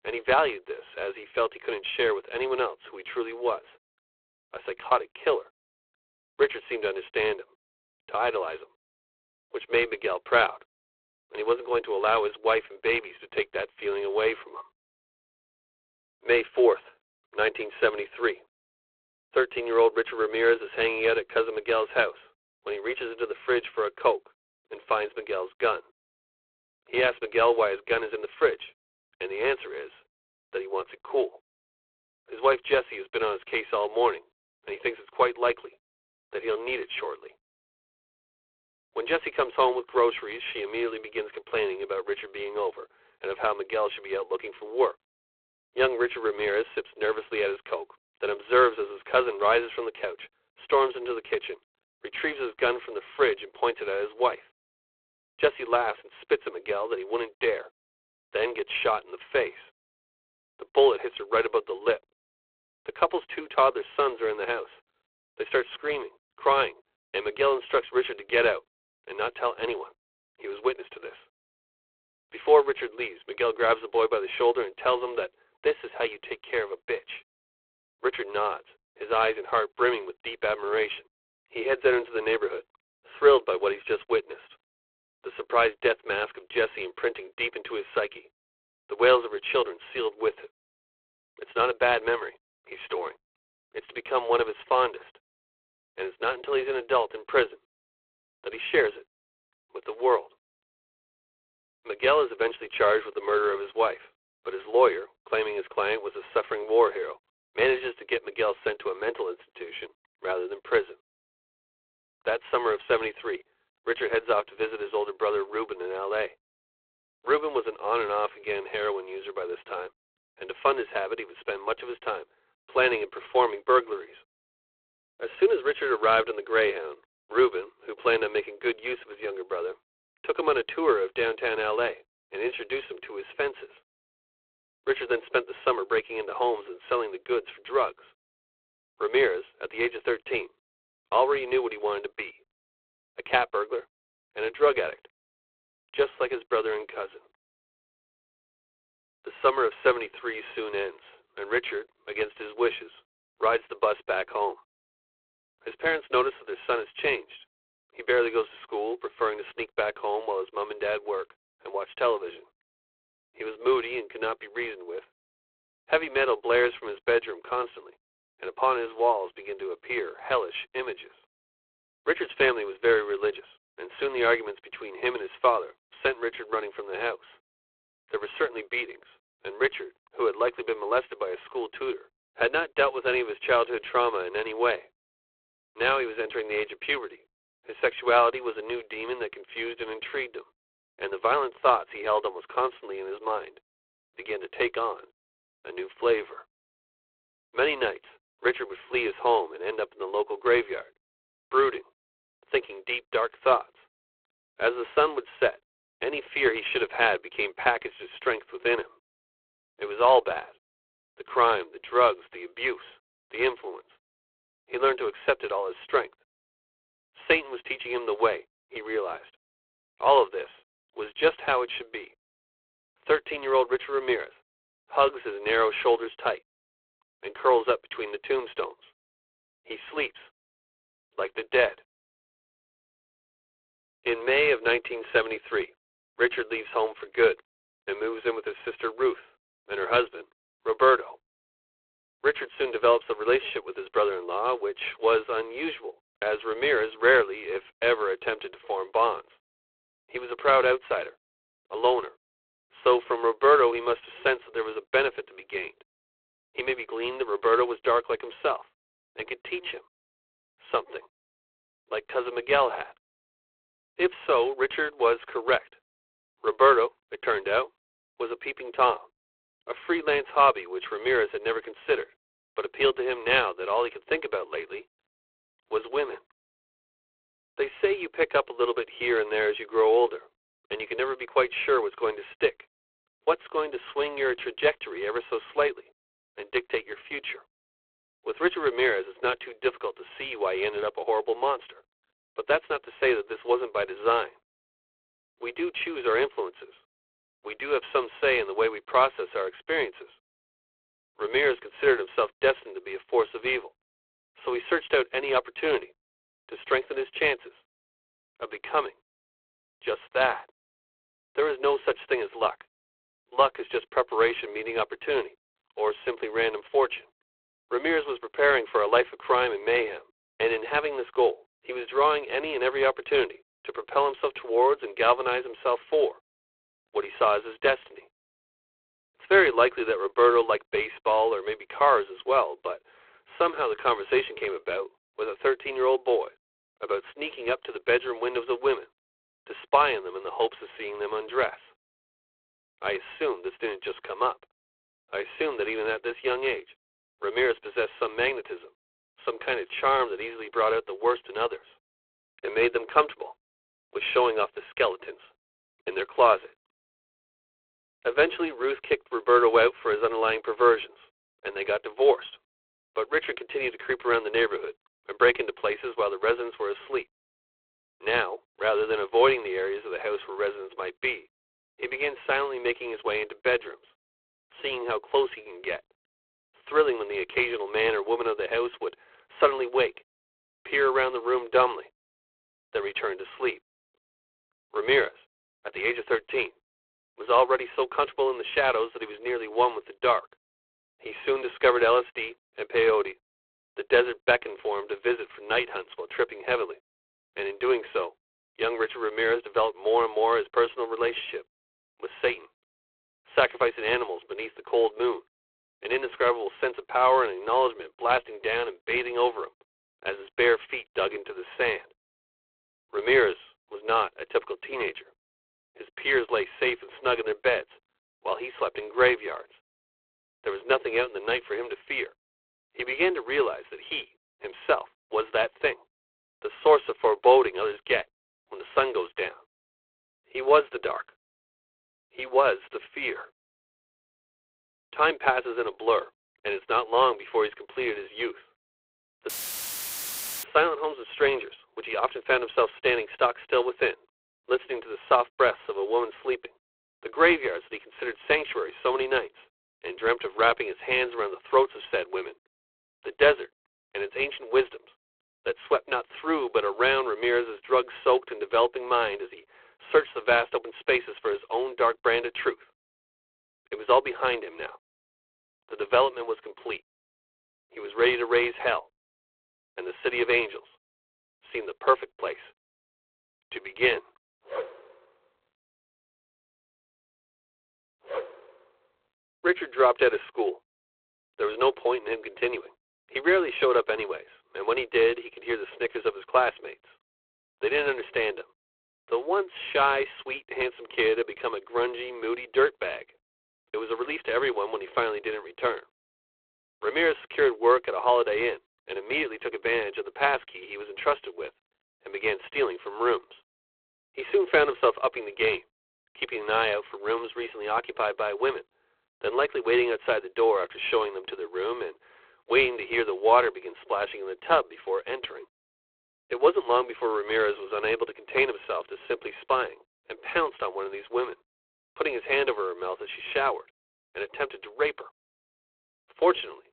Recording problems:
phone-call audio; poor line
audio cutting out; filled with static; at 7:19 for 1 s

